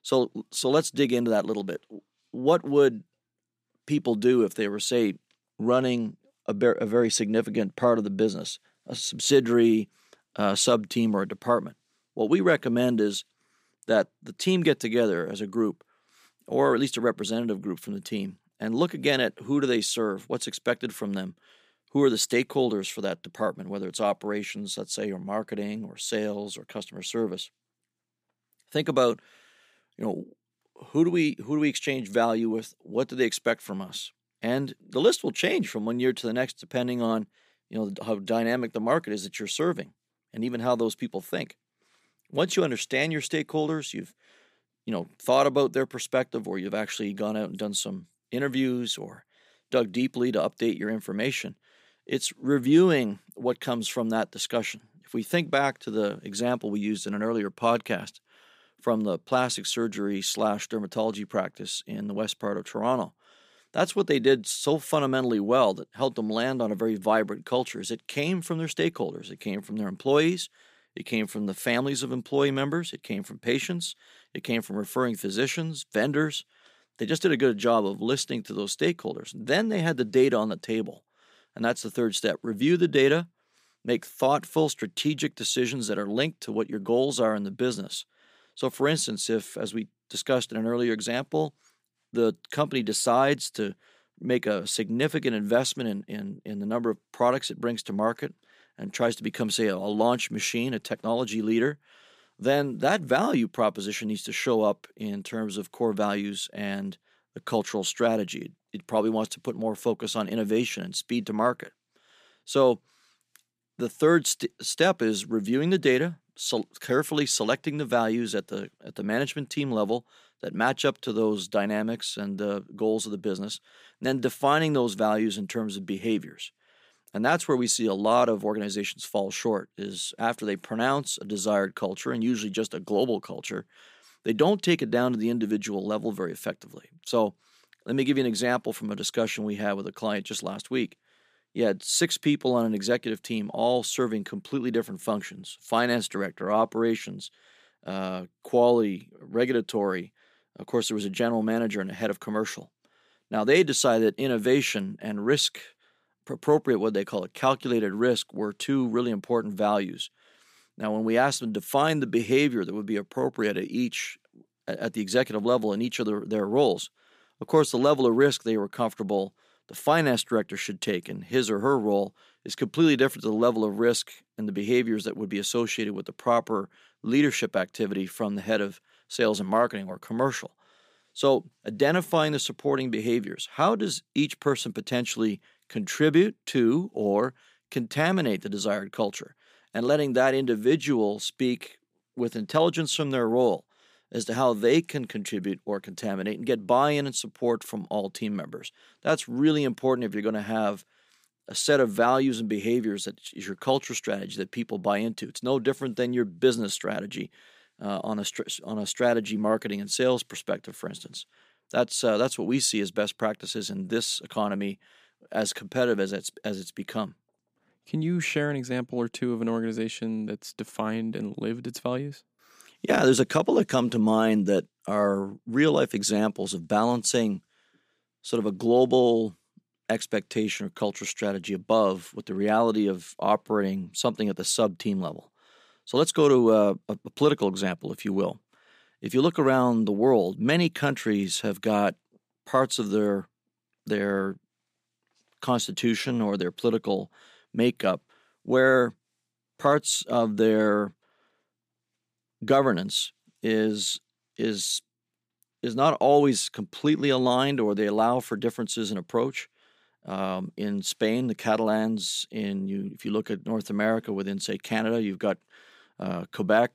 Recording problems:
none

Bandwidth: 15 kHz